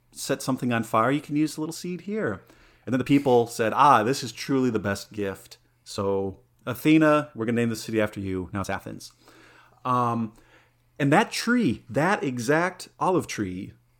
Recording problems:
uneven, jittery; strongly; from 1 to 13 s

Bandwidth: 18 kHz